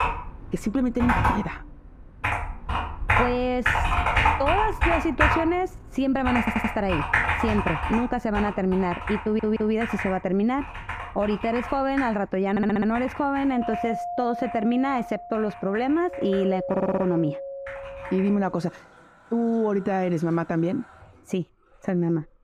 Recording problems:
muffled; very; fading above 2.5 kHz
household noises; loud; throughout; 1 dB below the speech
audio stuttering; 4 times, first at 6.5 s
doorbell; noticeable; from 14 to 19 s; peak 5 dB below the speech

